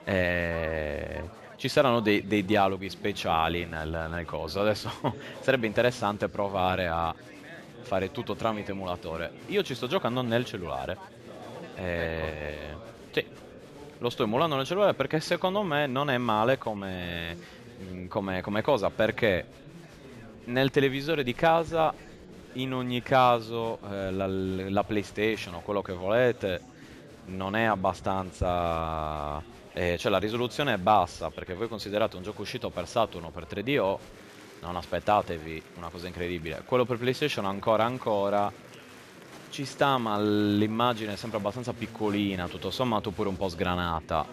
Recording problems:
chatter from many people; noticeable; throughout; 20 dB below the speech

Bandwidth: 14 kHz